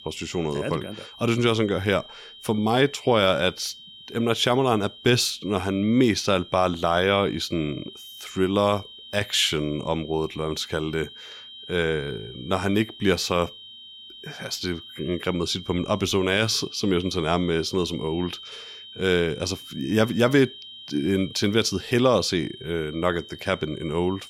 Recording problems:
high-pitched whine; noticeable; throughout; 3 kHz, 15 dB below the speech

